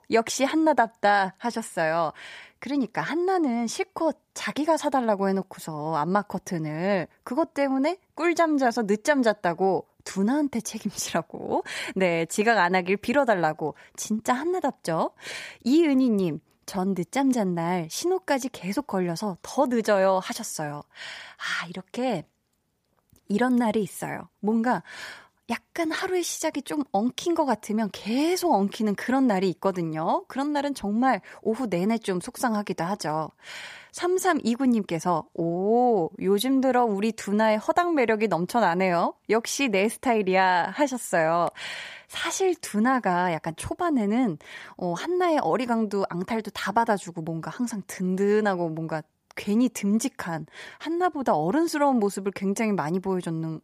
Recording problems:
none

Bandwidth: 15 kHz